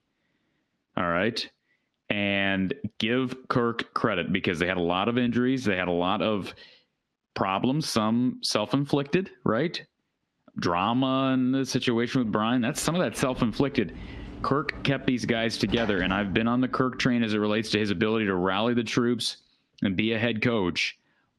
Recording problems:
muffled; very slightly; fading above 3.5 kHz
squashed, flat; somewhat
door banging; noticeable; from 13 to 17 s; peak 9 dB below the speech

